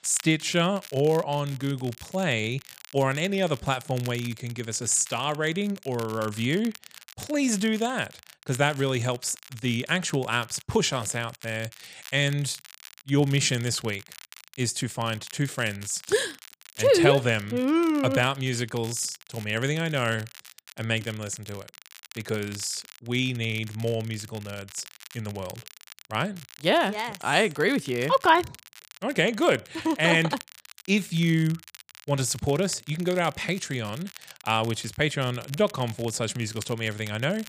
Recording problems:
crackle, like an old record; noticeable; 20 dB below the speech

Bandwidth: 15 kHz